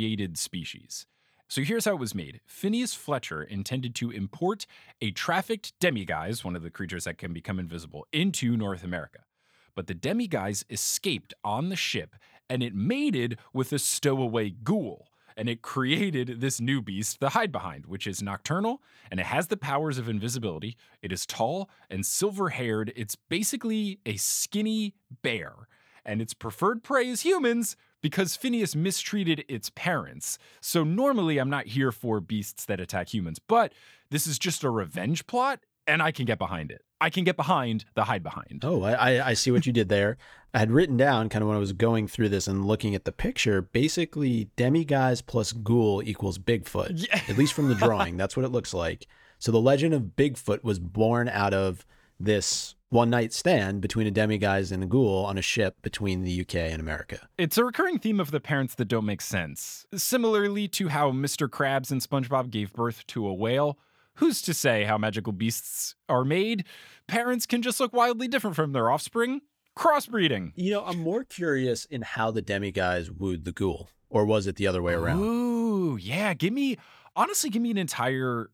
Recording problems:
abrupt cut into speech; at the start

